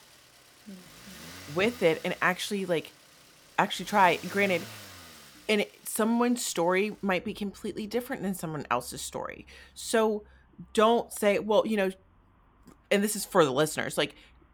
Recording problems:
traffic noise; faint; throughout; 20 dB below the speech

